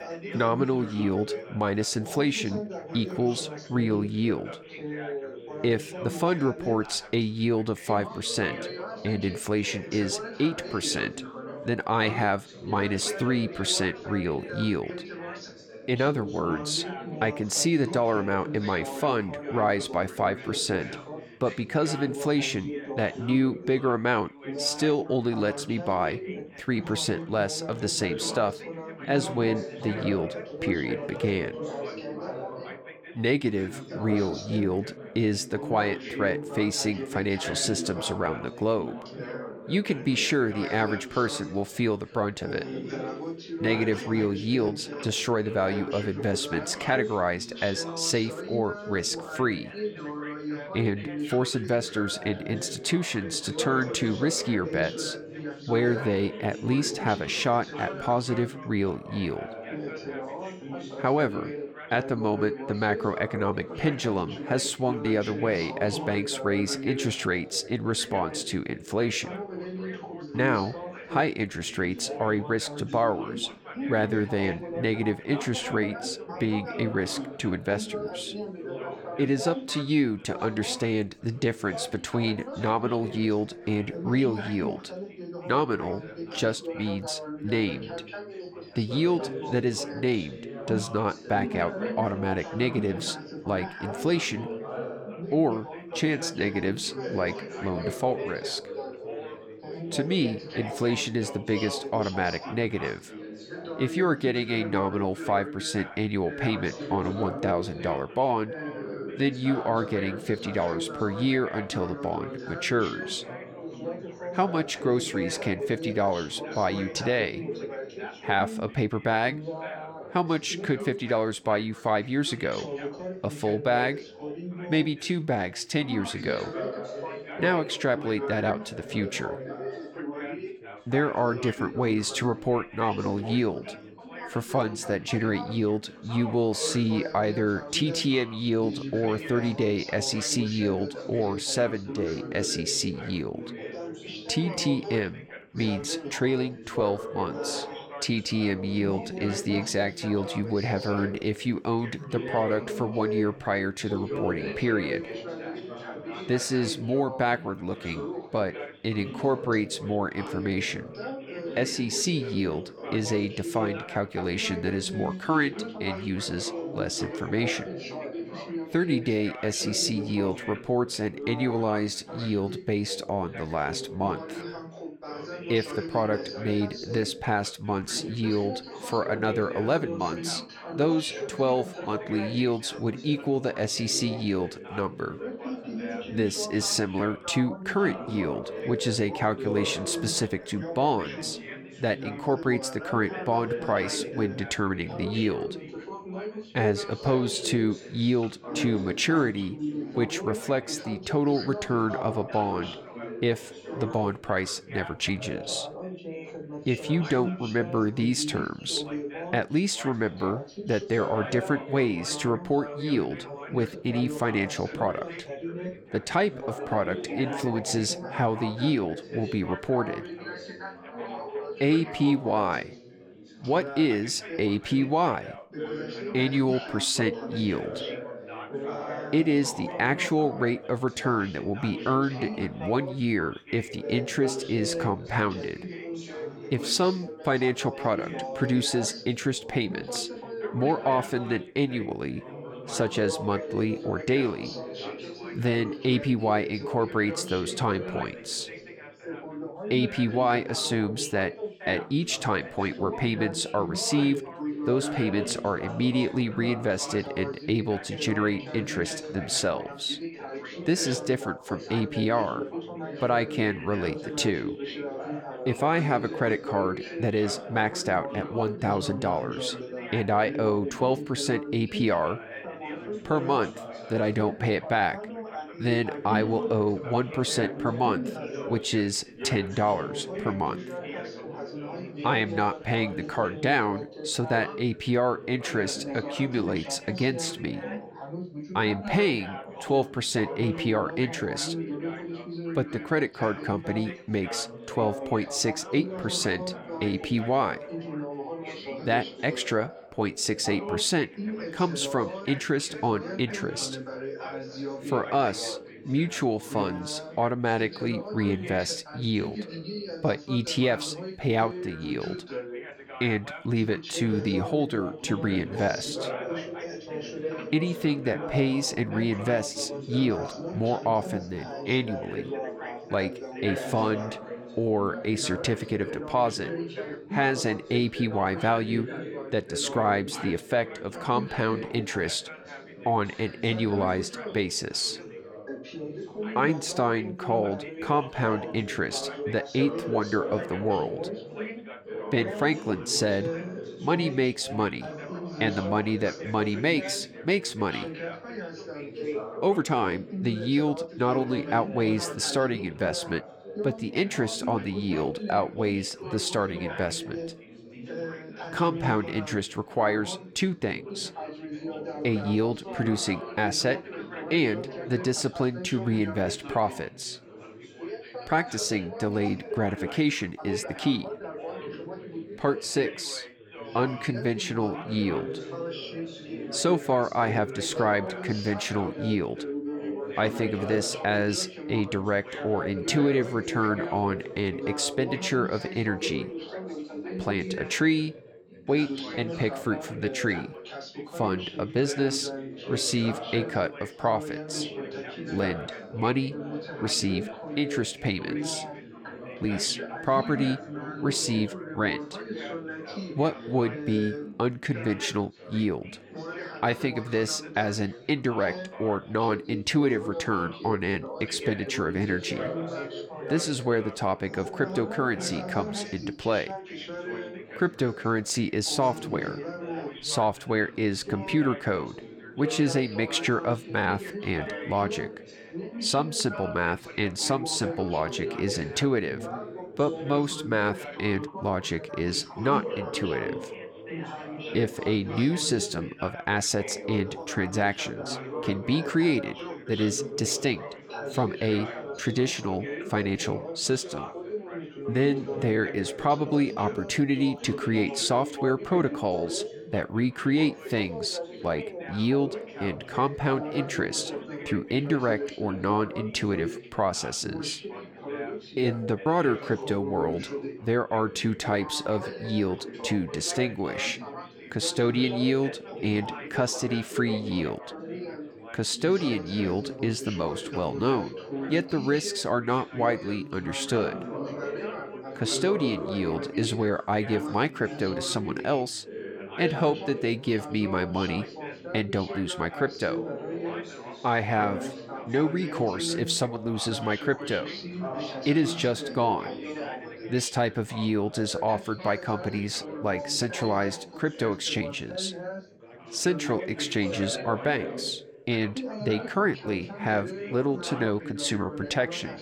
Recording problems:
background chatter; loud; throughout; 4 voices, 9 dB below the speech
uneven, jittery; slightly; from 1:58 to 7:24

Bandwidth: 18 kHz